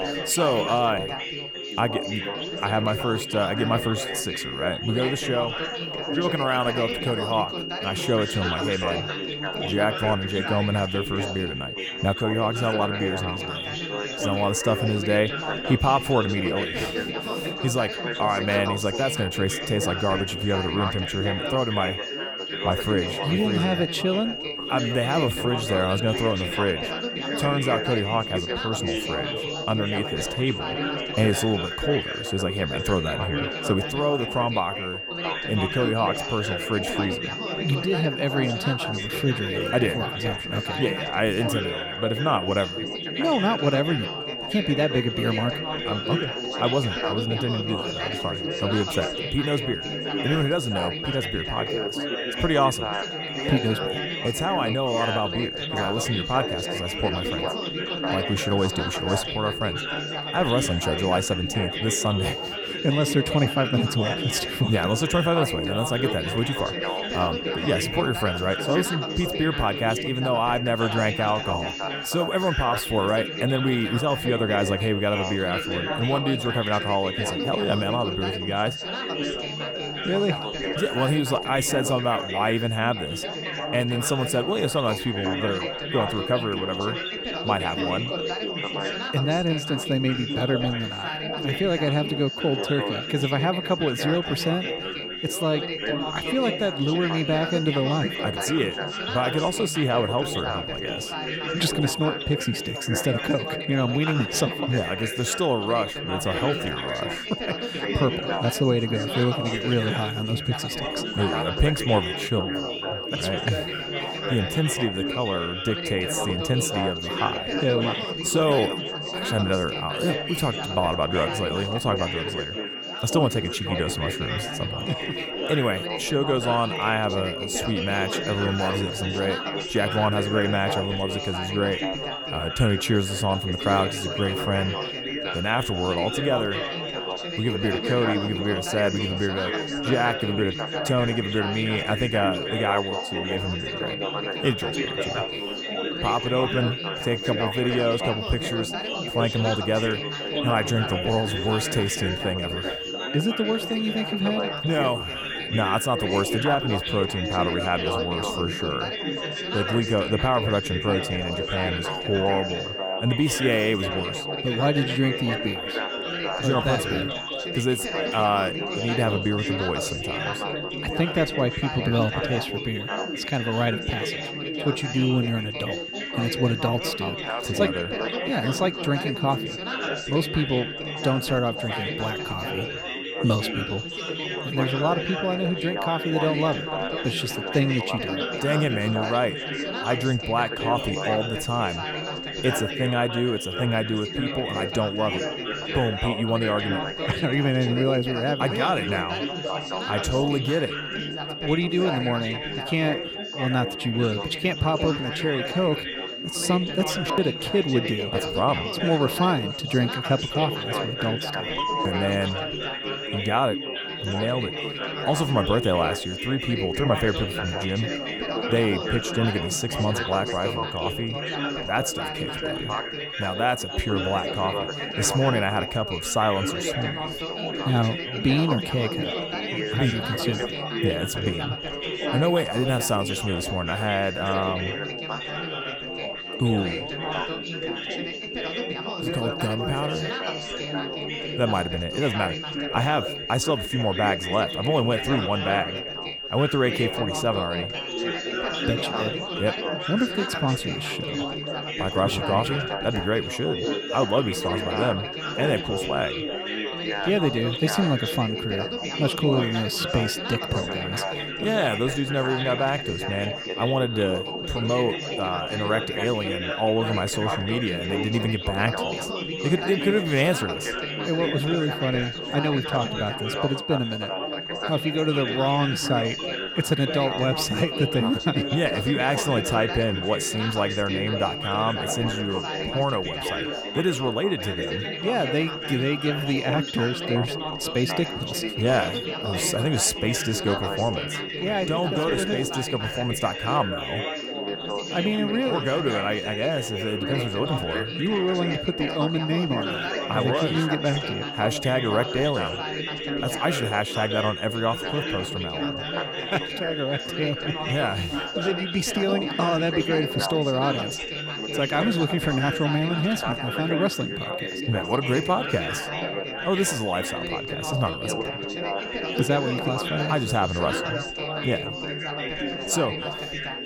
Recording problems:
high-pitched whine; loud; throughout; 3 kHz, 6 dB below the speech
chatter from many people; loud; throughout; 5 dB below the speech

